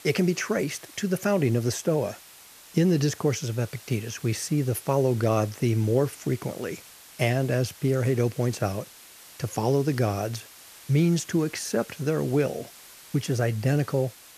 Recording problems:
hiss; noticeable; throughout; 20 dB below the speech

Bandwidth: 14.5 kHz